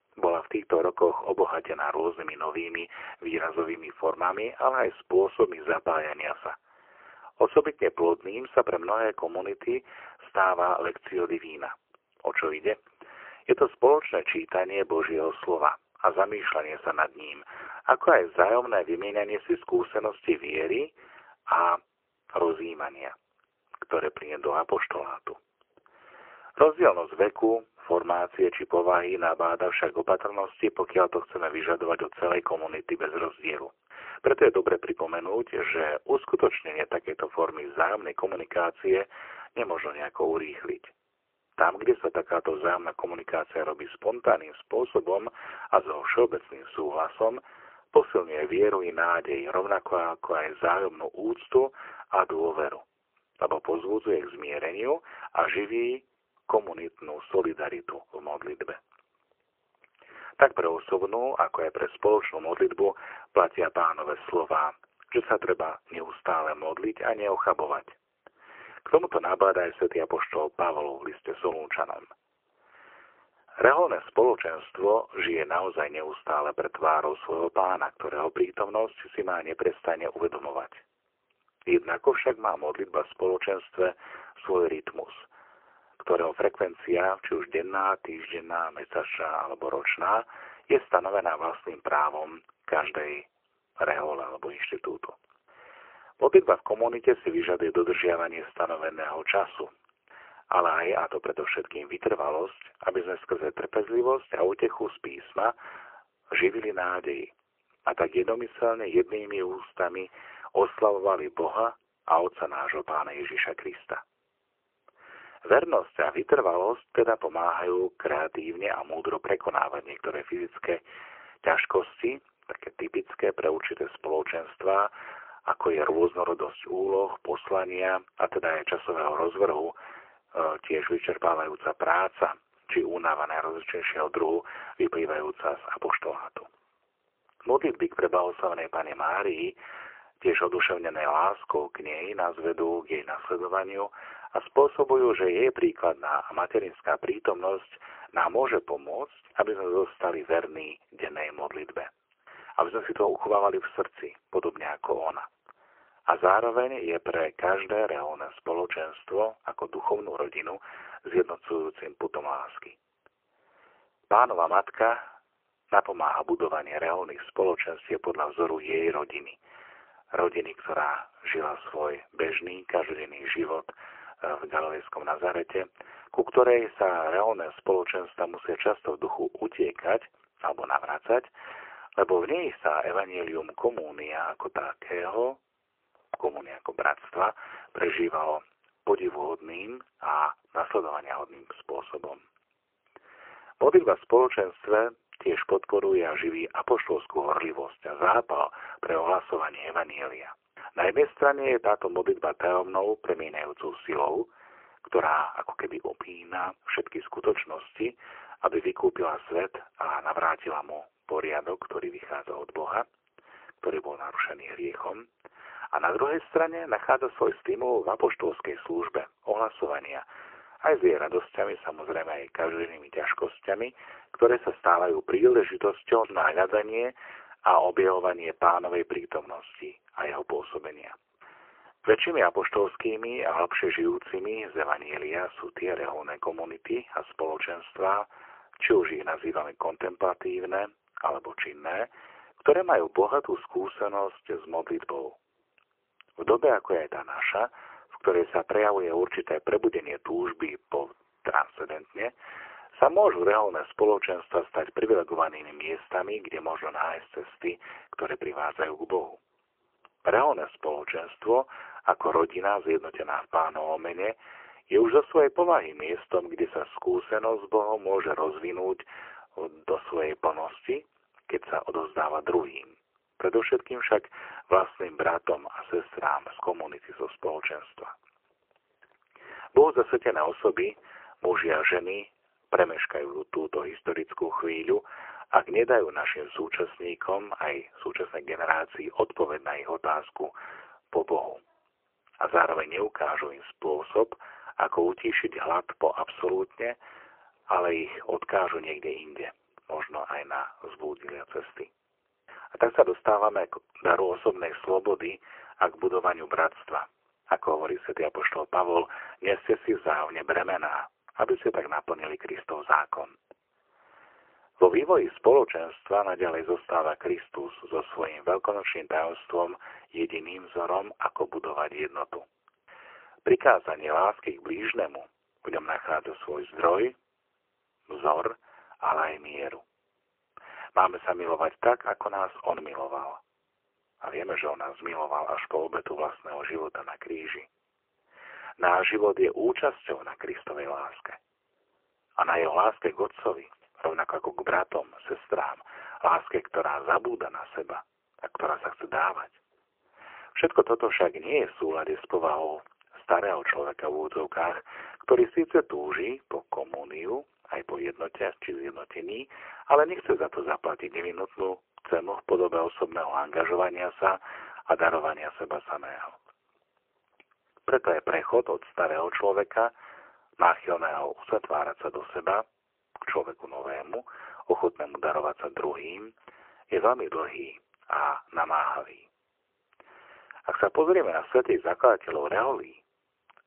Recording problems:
phone-call audio; poor line; nothing above 3 kHz

